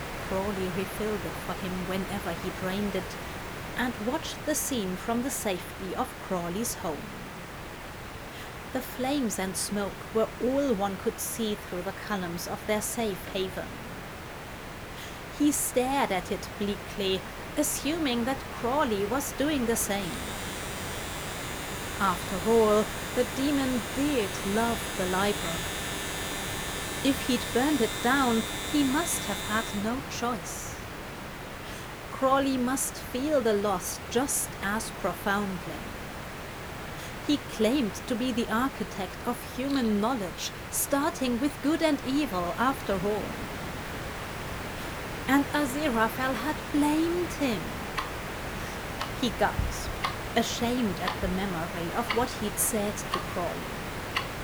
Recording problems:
household noises; loud; throughout; 7 dB below the speech
hiss; loud; throughout; 8 dB below the speech

